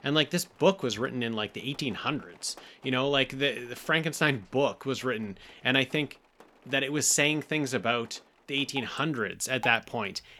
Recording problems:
rain or running water; faint; throughout; 25 dB below the speech

